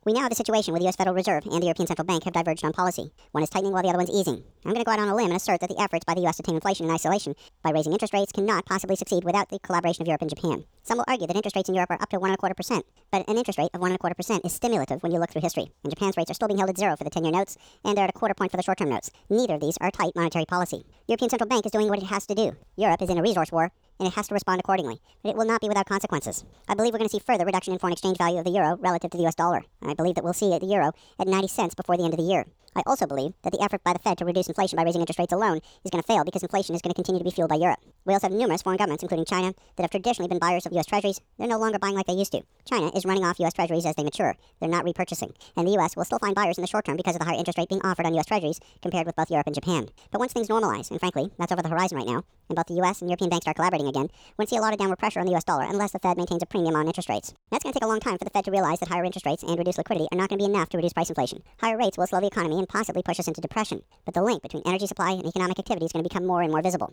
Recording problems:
wrong speed and pitch; too fast and too high; 1.6 times normal speed

